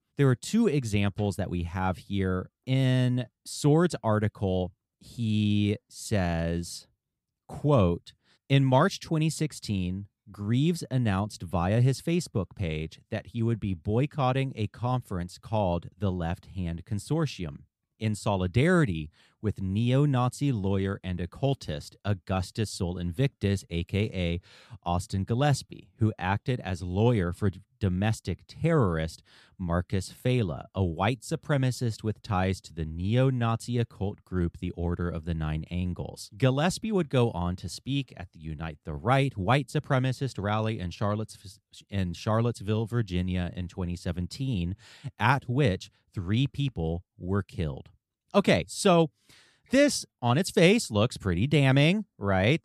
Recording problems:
none

